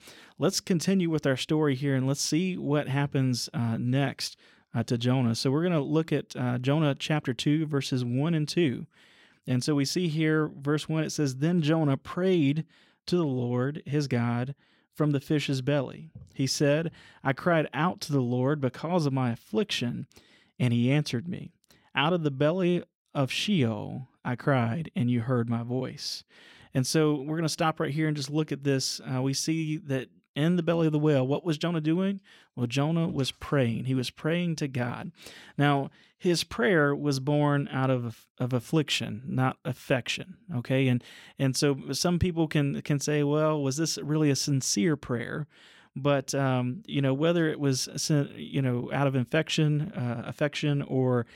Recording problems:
none

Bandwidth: 16.5 kHz